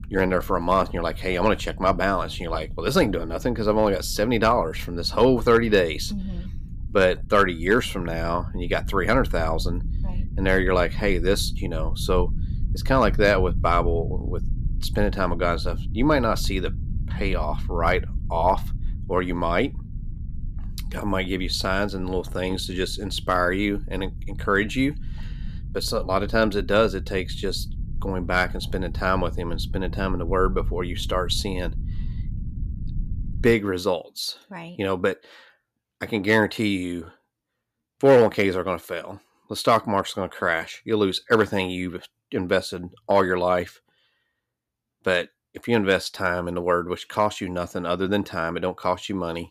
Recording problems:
low rumble; faint; until 34 s; 25 dB below the speech

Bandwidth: 14.5 kHz